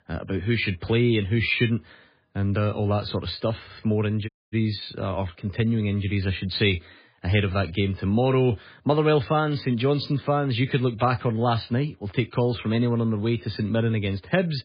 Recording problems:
garbled, watery; badly; nothing above 4.5 kHz
audio cutting out; at 4.5 s

